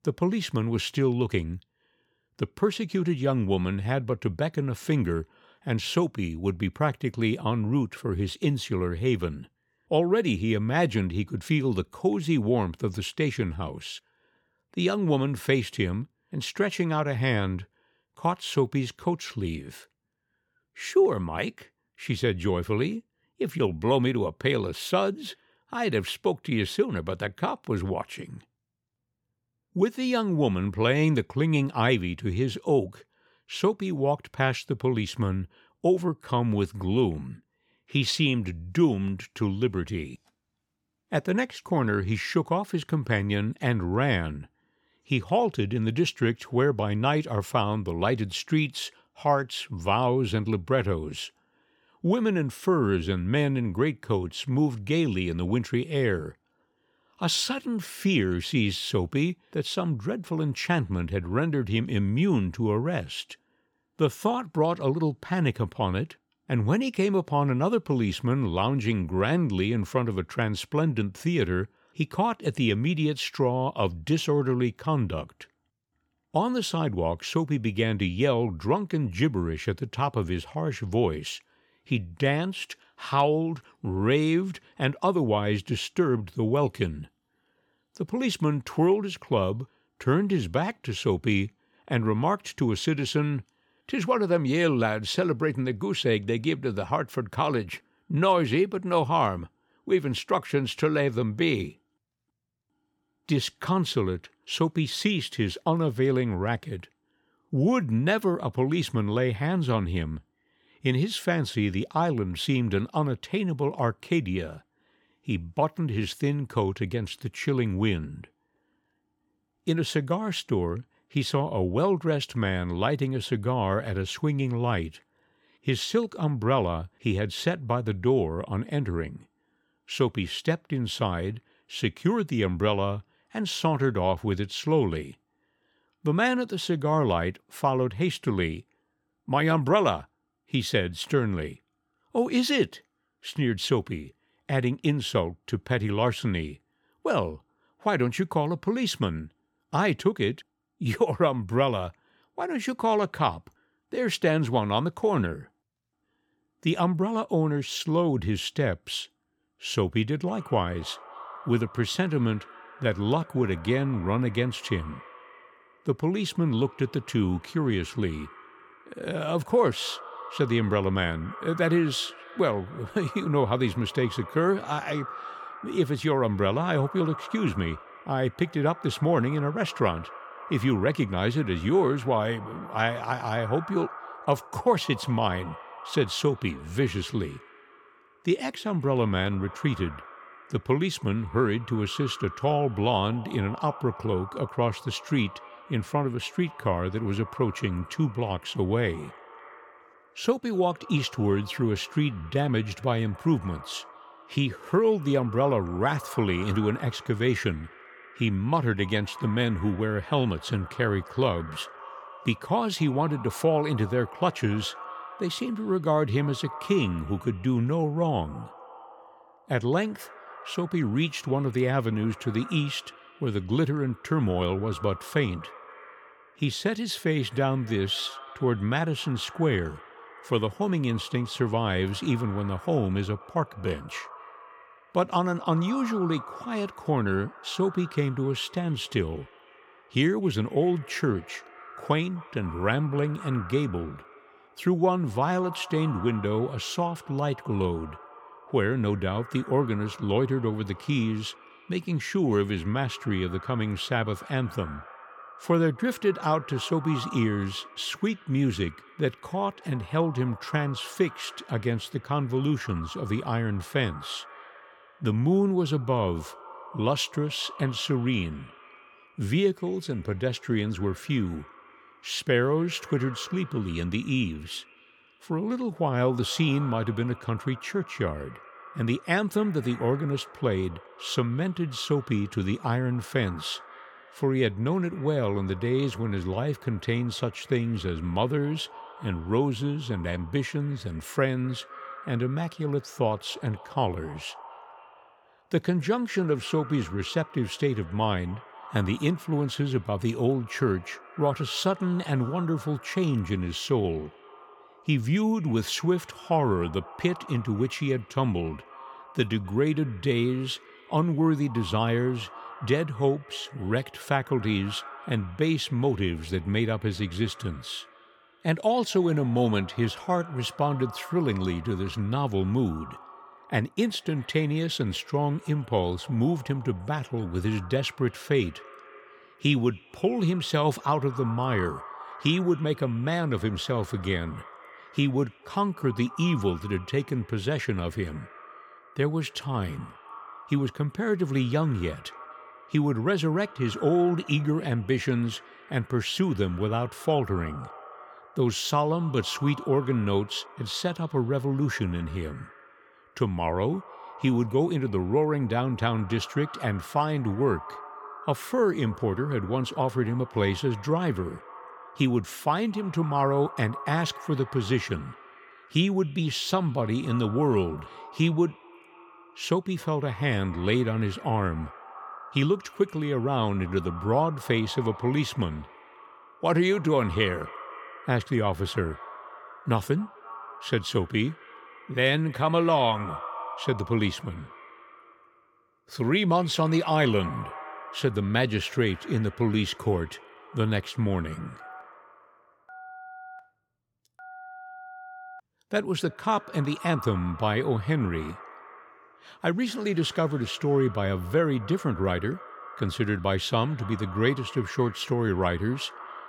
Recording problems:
echo of what is said; noticeable; from 2:40 on; 250 ms later, 20 dB below the speech
phone ringing; faint; from 6:32 to 6:35; peak 15 dB below the speech

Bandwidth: 17.5 kHz